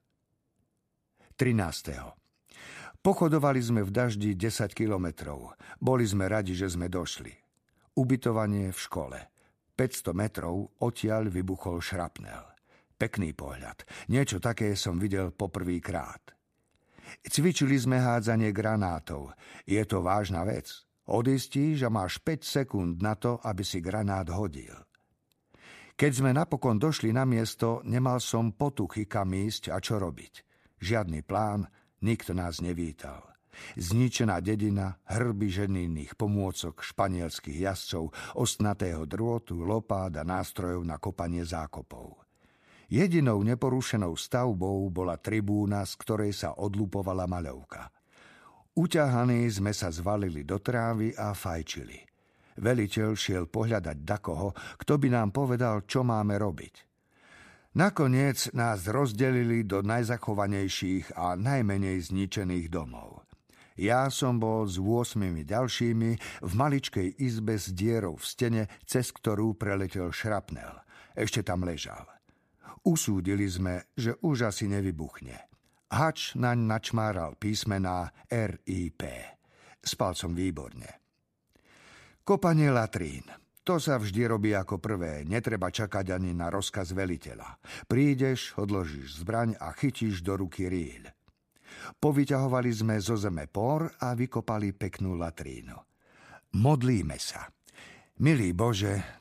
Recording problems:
none

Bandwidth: 14.5 kHz